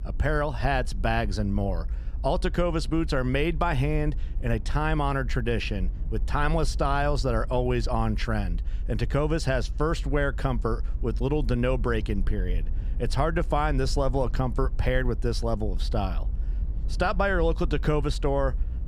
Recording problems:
low rumble; faint; throughout; 25 dB below the speech

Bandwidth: 15 kHz